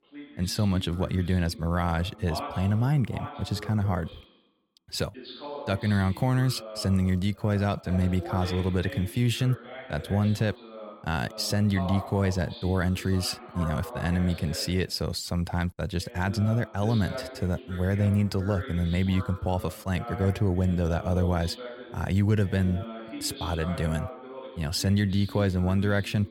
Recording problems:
voice in the background; noticeable; throughout; 15 dB below the speech

